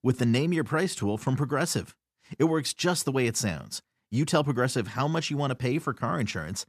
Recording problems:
none

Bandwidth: 14.5 kHz